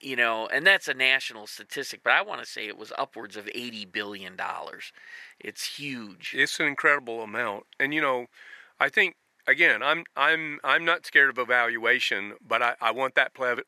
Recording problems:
thin; very; fading below 400 Hz

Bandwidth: 13.5 kHz